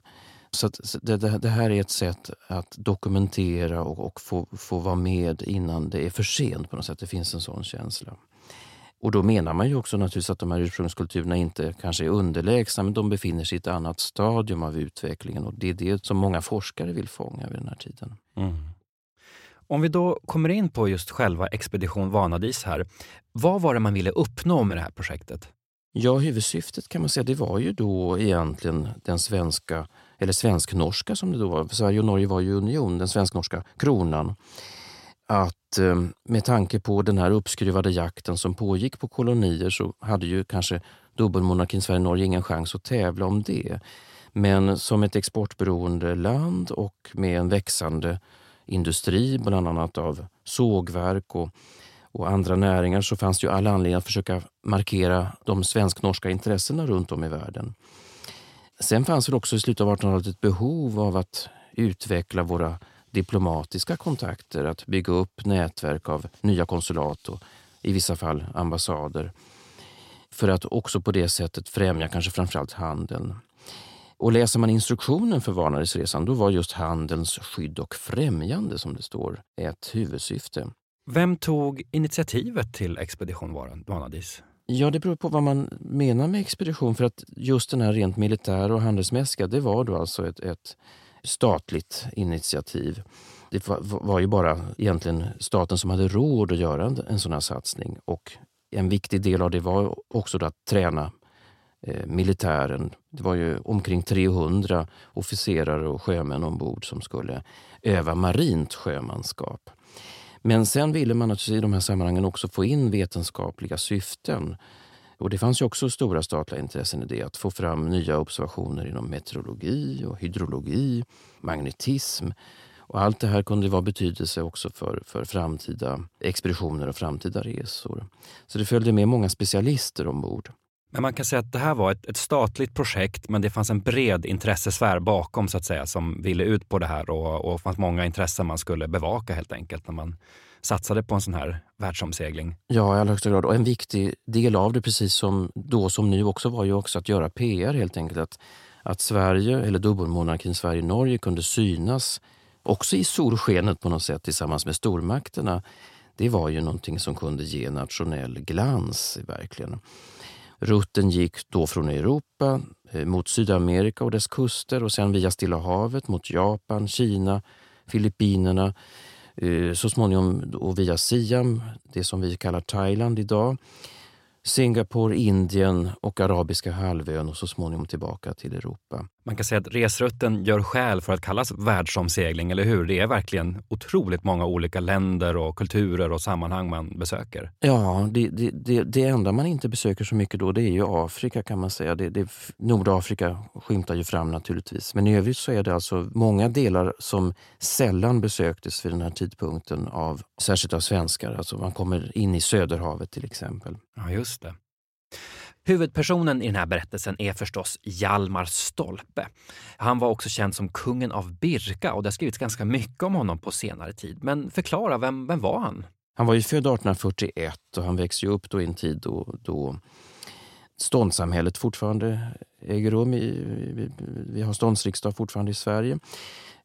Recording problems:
uneven, jittery; strongly; from 18 s to 3:44

